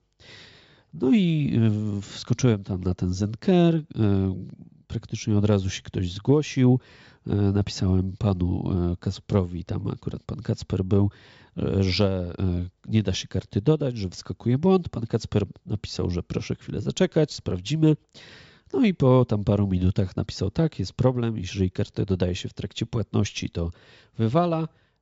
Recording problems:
high frequencies cut off; noticeable; nothing above 8 kHz

